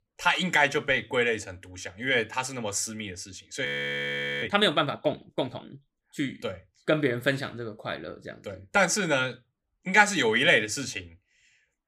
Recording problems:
audio freezing; at 3.5 s for 1 s

